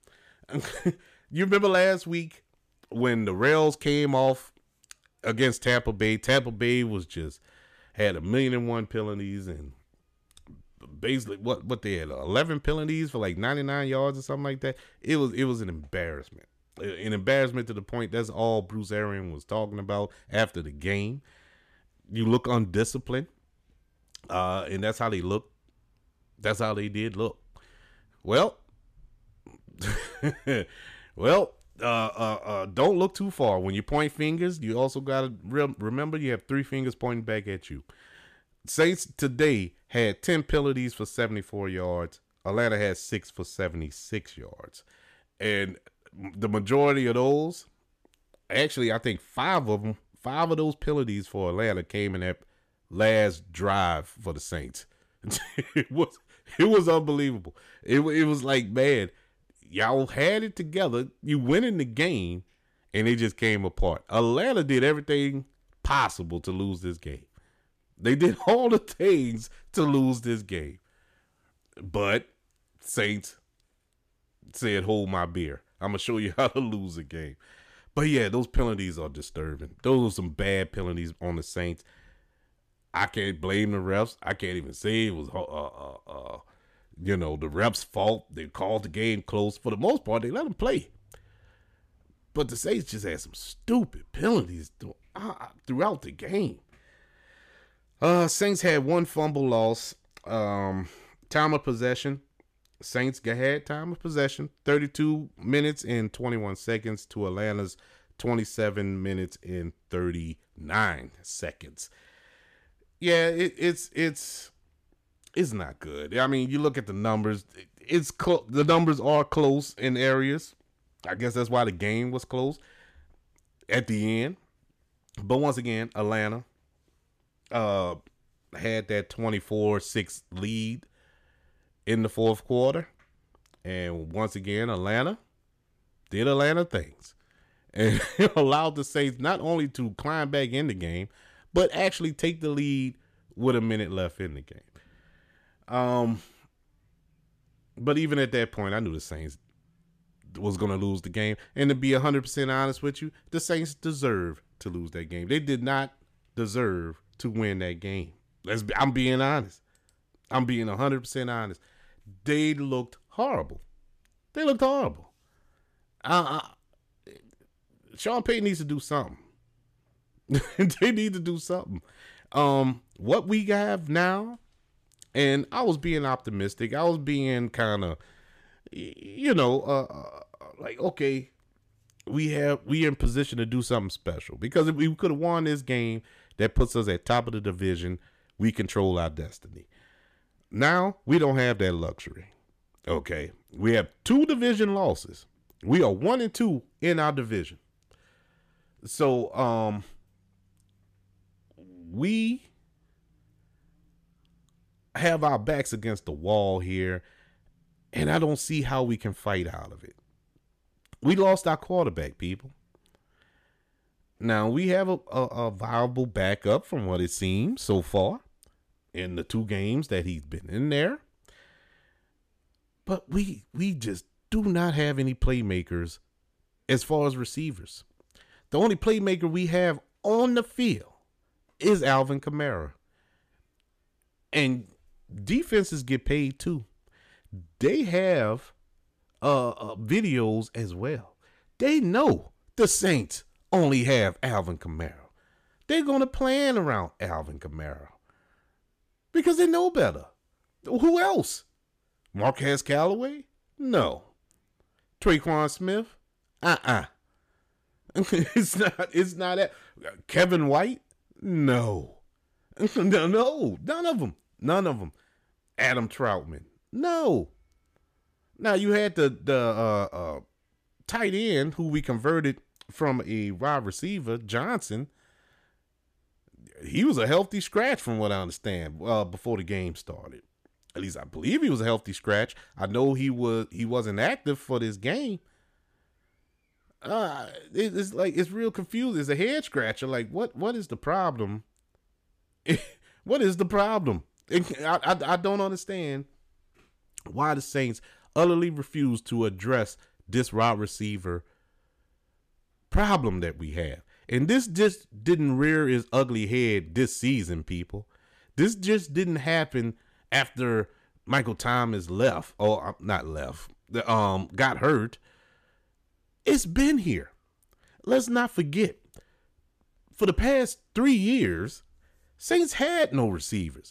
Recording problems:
none

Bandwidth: 14.5 kHz